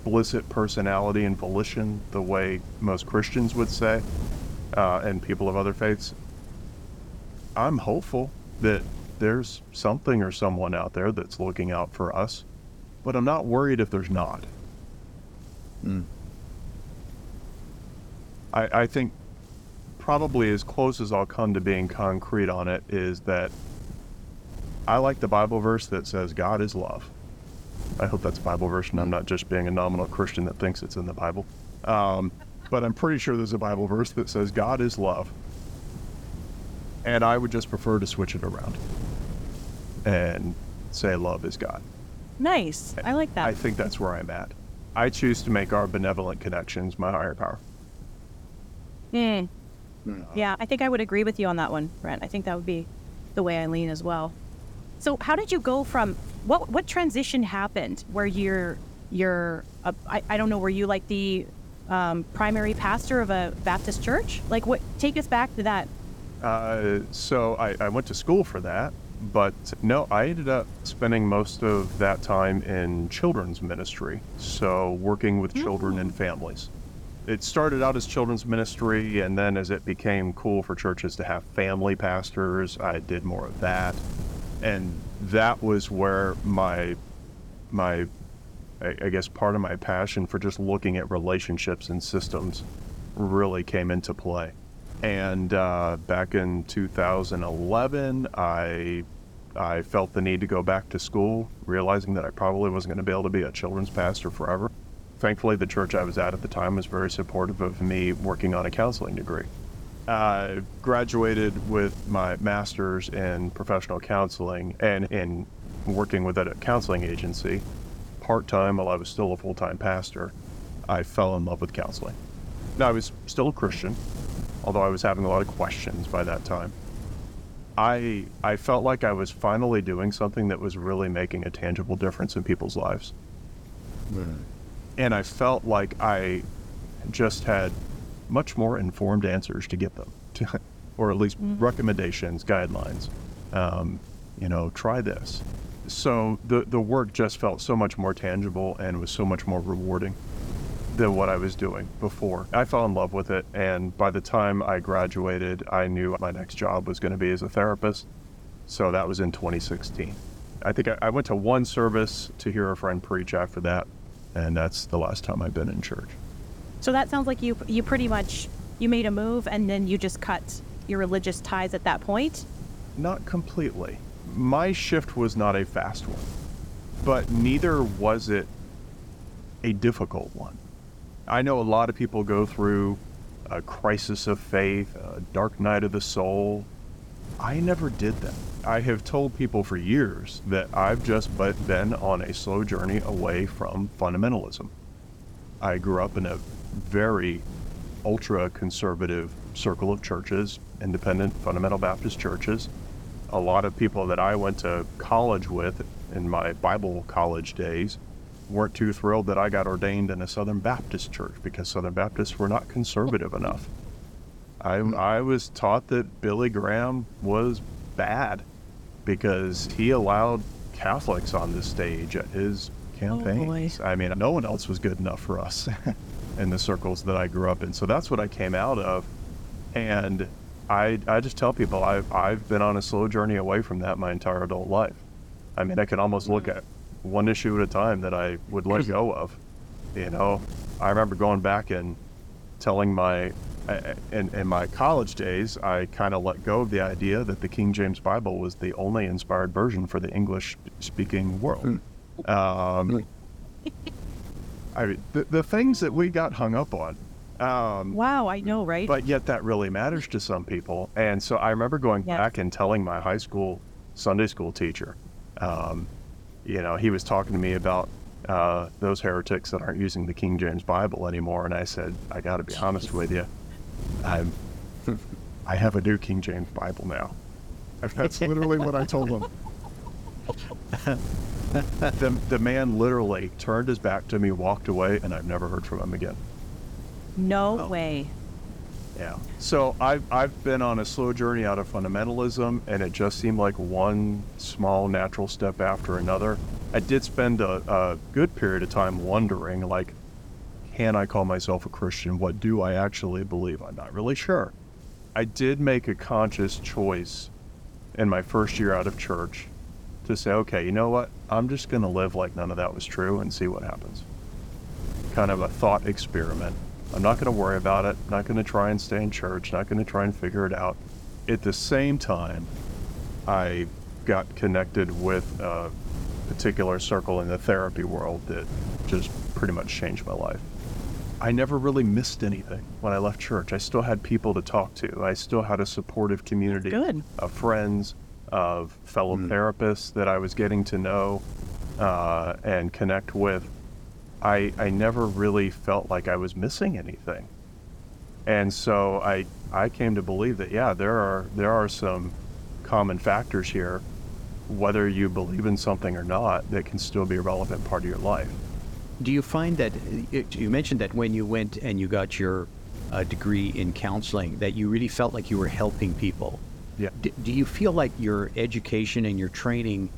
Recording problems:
wind noise on the microphone; occasional gusts; 20 dB below the speech

